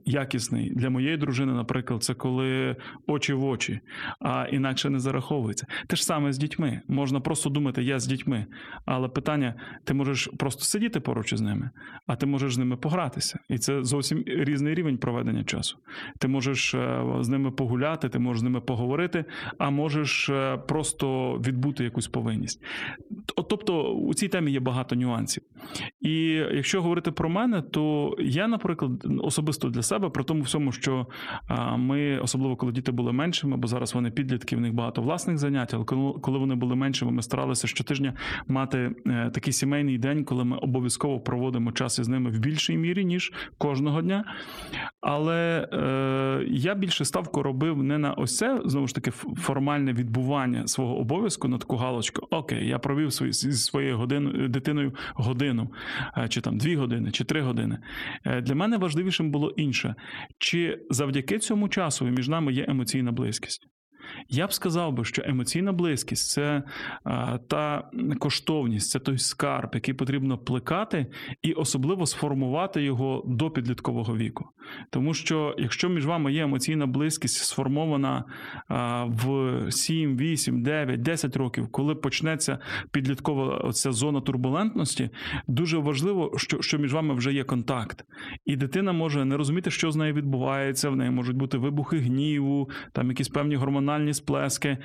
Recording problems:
squashed, flat; heavily

